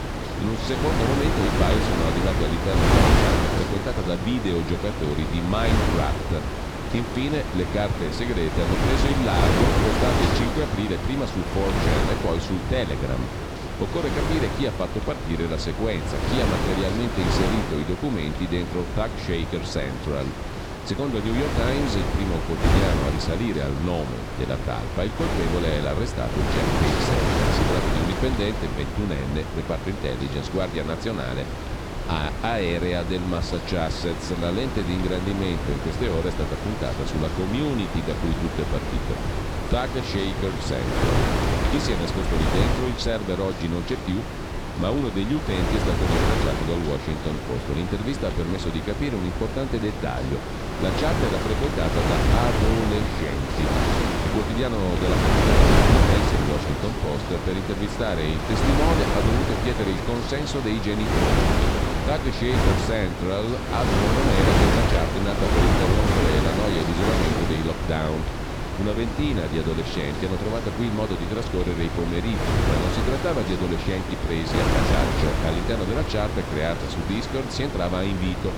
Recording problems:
wind noise on the microphone; heavy; 2 dB above the speech

